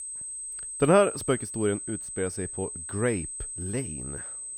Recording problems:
high-pitched whine; loud; throughout; 8 kHz, 7 dB below the speech

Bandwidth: 18.5 kHz